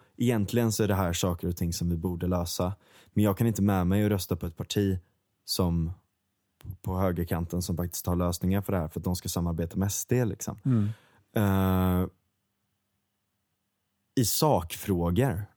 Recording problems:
none

